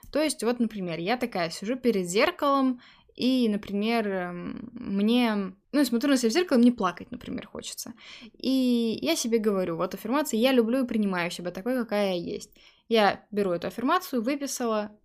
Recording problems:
none

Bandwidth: 15 kHz